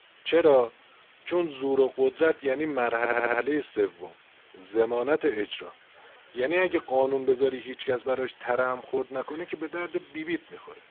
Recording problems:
phone-call audio; poor line
hiss; faint; throughout; 25 dB below the speech
audio stuttering; at 3 s

